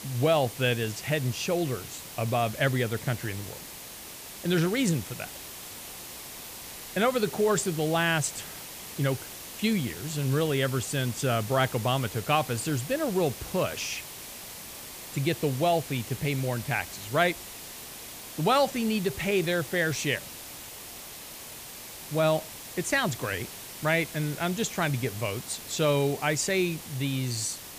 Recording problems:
hiss; noticeable; throughout; 10 dB below the speech

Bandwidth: 15 kHz